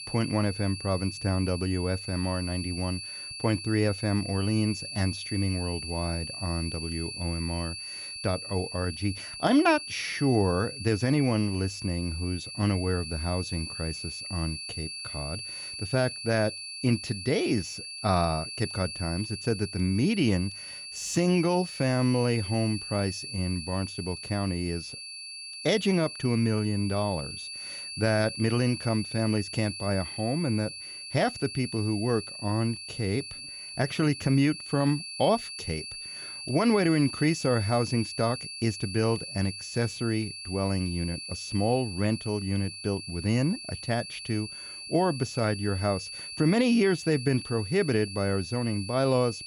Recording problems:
high-pitched whine; loud; throughout; 4.5 kHz, 8 dB below the speech

